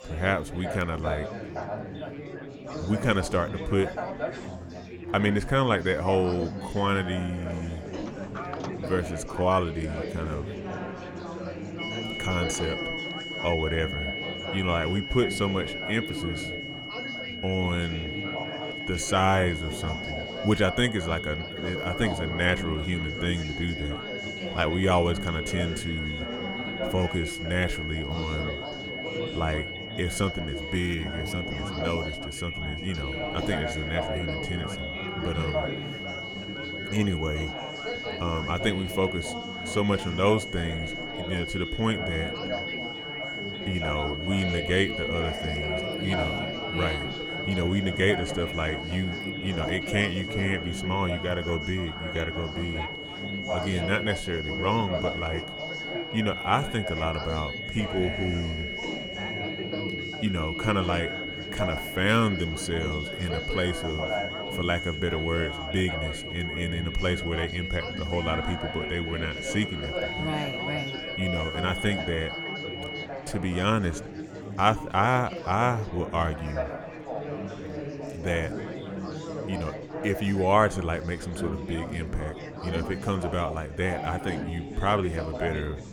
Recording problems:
high-pitched whine; loud; from 12 s to 1:13; 2 kHz, 5 dB below the speech
chatter from many people; loud; throughout; 7 dB below the speech
door banging; noticeable; from 8 to 13 s; peak 10 dB below the speech

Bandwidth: 17.5 kHz